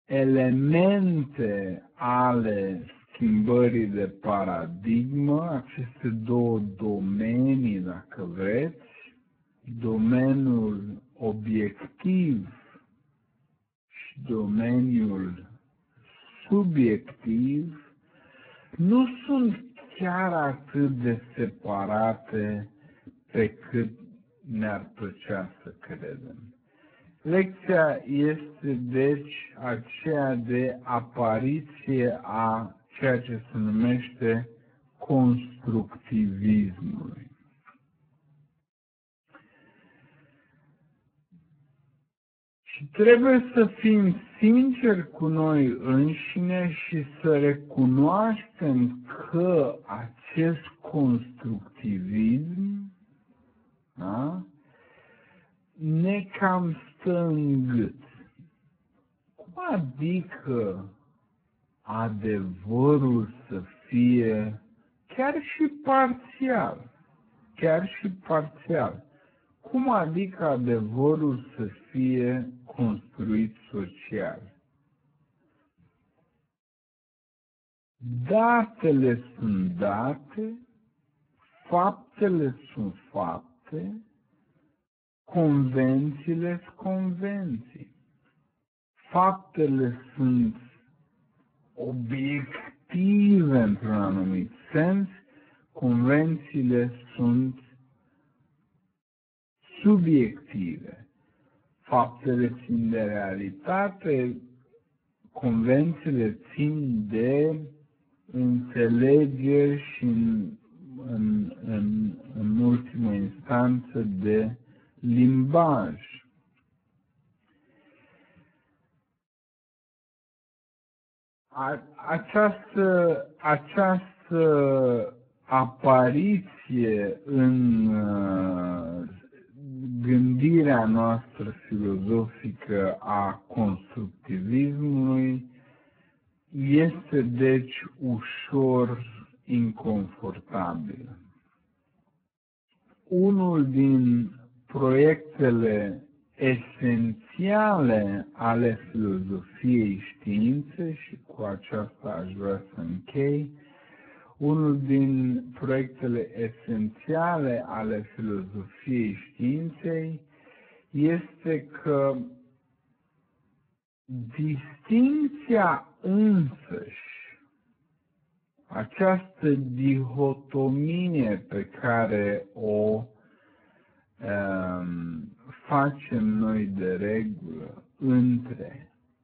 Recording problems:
garbled, watery; badly; nothing above 4 kHz
wrong speed, natural pitch; too slow; 0.5 times normal speed

